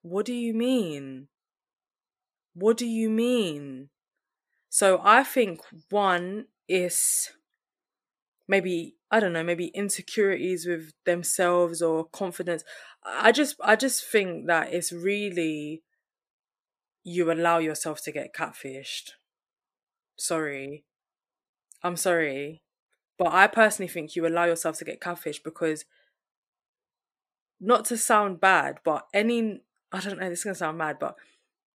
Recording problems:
none

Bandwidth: 14.5 kHz